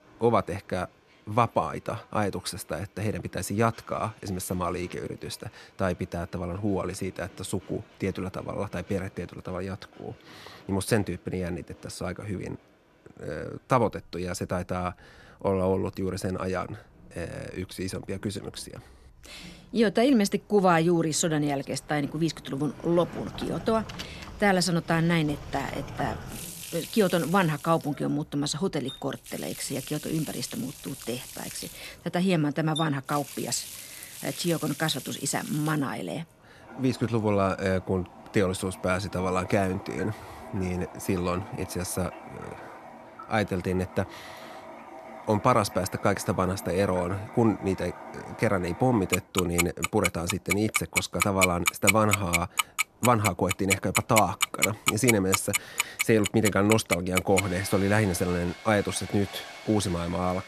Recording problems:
household noises; loud; from 22 s on; 4 dB below the speech
train or aircraft noise; faint; throughout; 25 dB below the speech

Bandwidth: 13.5 kHz